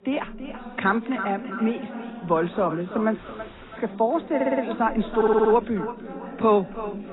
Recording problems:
echo of what is said; strong; throughout; 330 ms later, 10 dB below the speech
garbled, watery; badly; nothing above 4 kHz
background chatter; noticeable; throughout; 2 voices, 15 dB below the speech
audio cutting out; at 3 s for 0.5 s
audio stuttering; at 4.5 s and at 5 s

